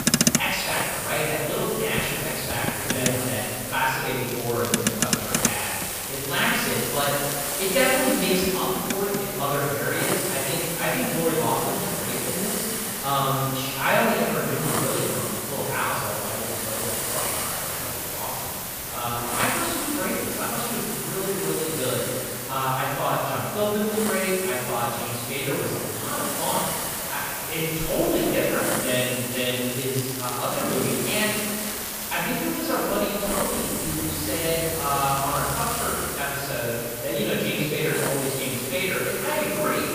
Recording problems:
room echo; strong; dies away in 2.2 s
off-mic speech; far
traffic noise; loud; throughout; 4 dB below the speech
hiss; loud; throughout; 2 dB below the speech
crackling; noticeable; 4 times, first at 4.5 s; 10 dB below the speech

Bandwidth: 15 kHz